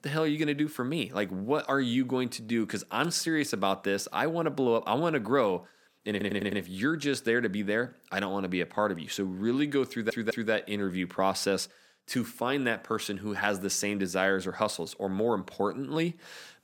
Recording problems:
audio stuttering; at 6 s and at 10 s

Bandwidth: 17 kHz